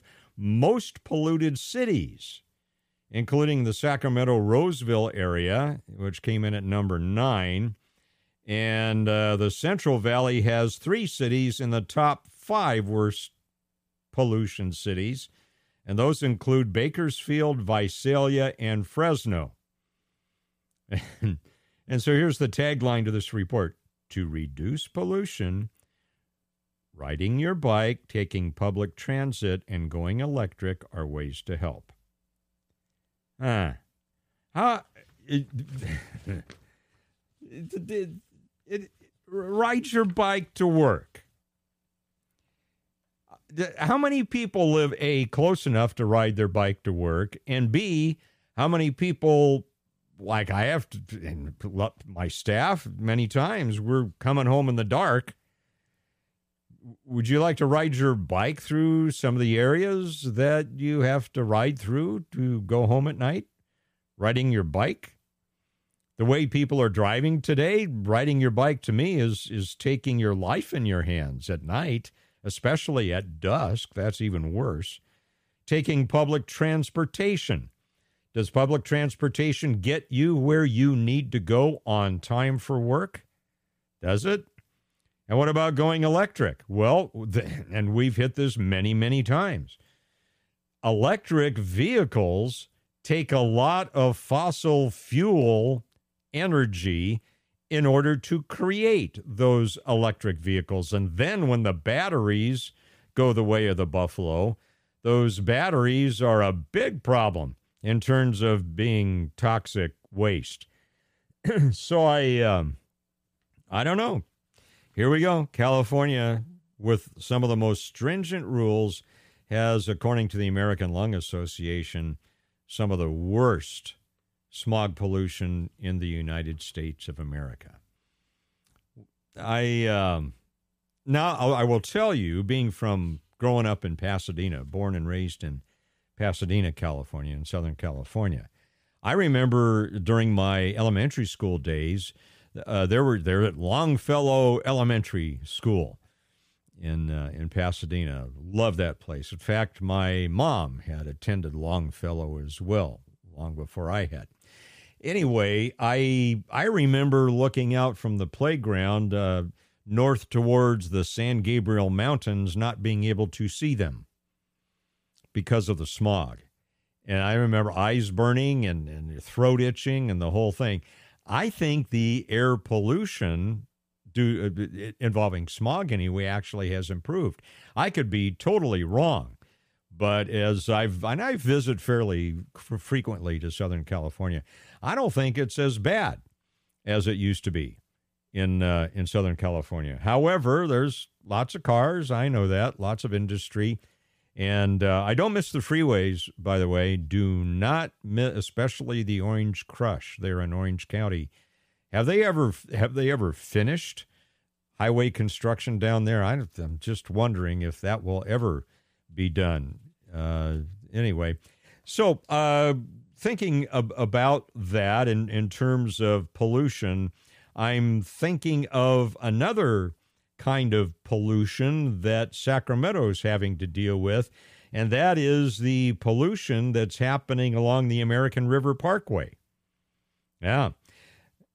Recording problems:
none

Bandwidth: 15 kHz